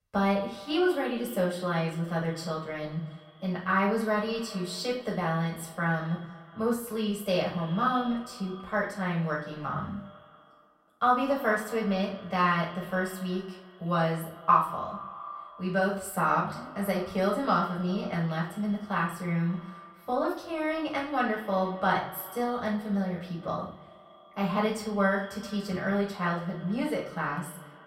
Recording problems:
off-mic speech; far
echo of what is said; noticeable; throughout; 190 ms later, 15 dB below the speech
room echo; slight; dies away in 0.4 s

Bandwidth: 16 kHz